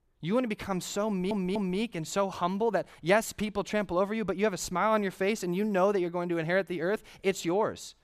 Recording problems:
audio stuttering; at 1 s

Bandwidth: 14.5 kHz